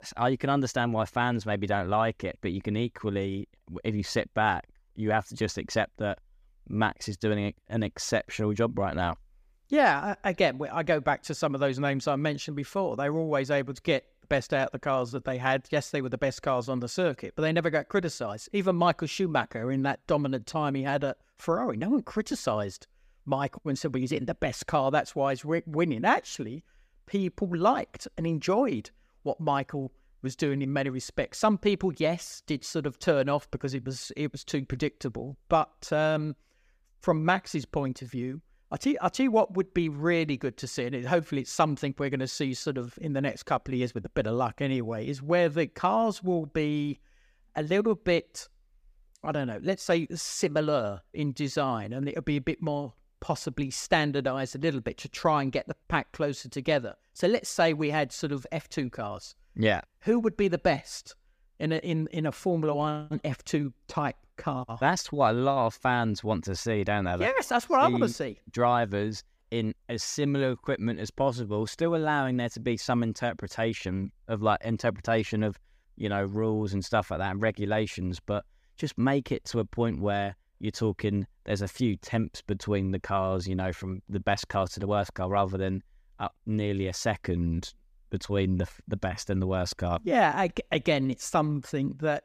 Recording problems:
none

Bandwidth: 15 kHz